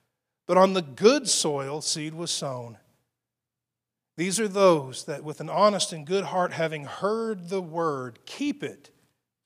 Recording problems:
none

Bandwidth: 15 kHz